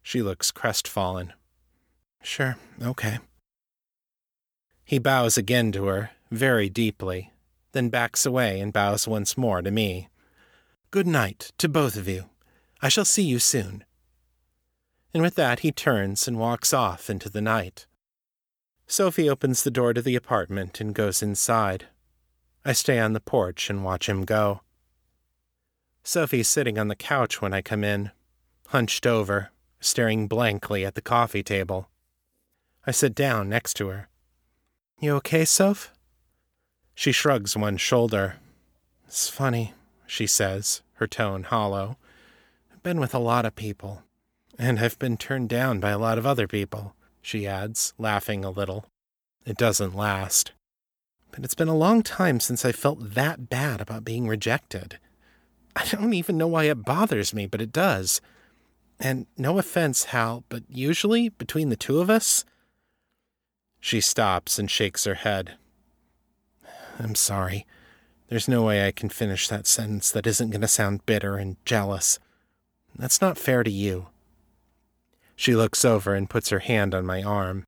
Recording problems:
none

